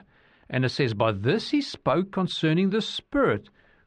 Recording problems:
muffled; slightly; fading above 2 kHz

